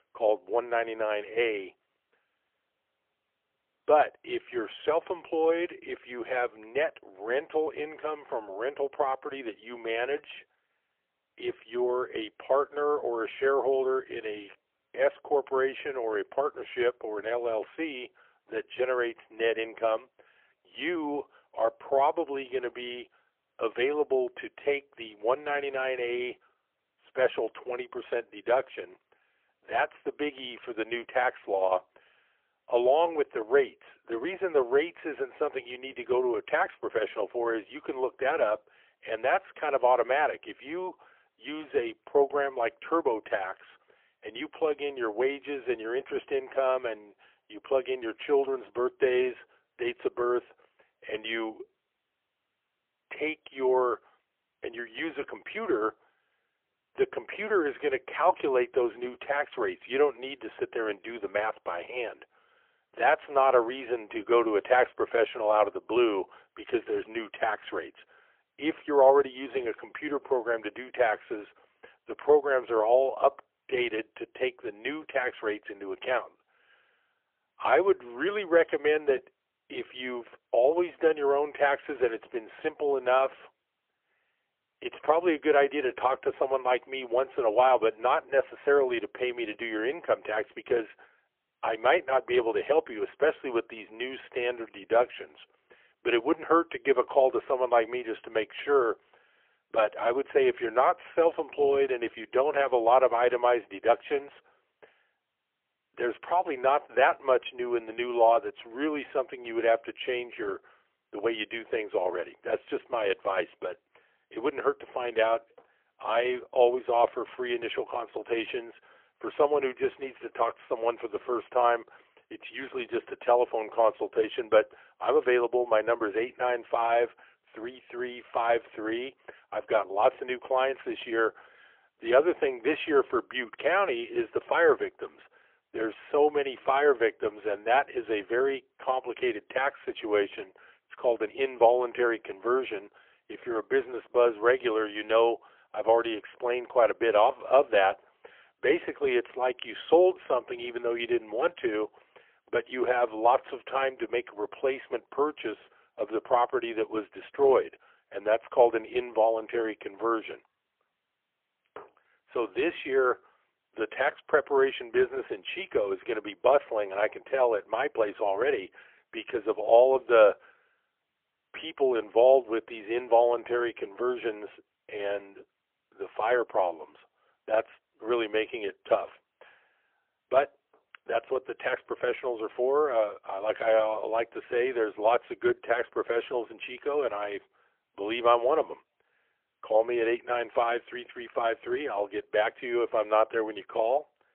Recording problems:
phone-call audio; poor line; nothing above 3.5 kHz

